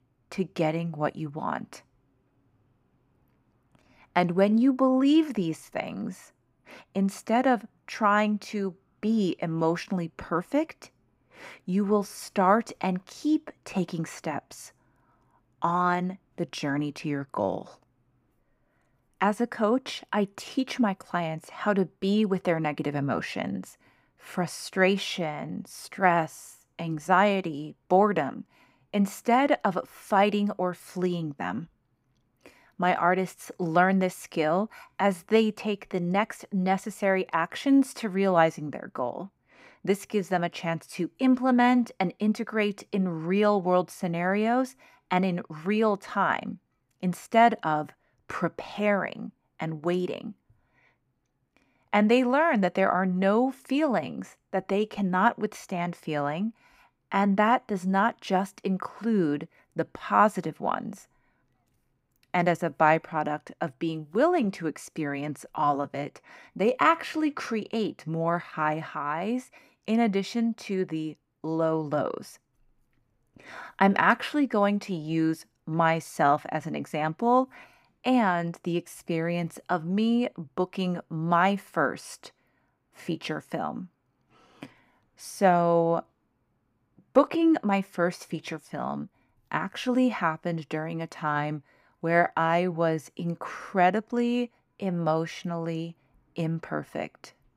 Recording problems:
none

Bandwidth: 15.5 kHz